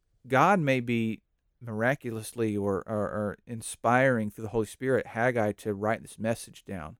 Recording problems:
none

